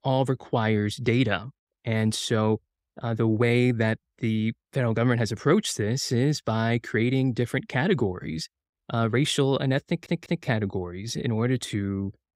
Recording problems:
audio stuttering; at 10 s

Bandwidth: 15.5 kHz